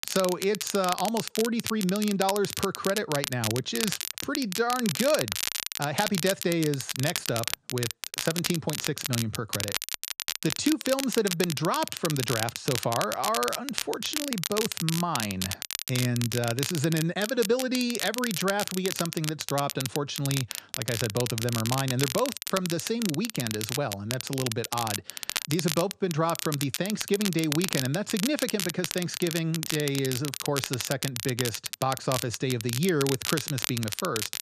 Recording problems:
crackle, like an old record; loud; 3 dB below the speech

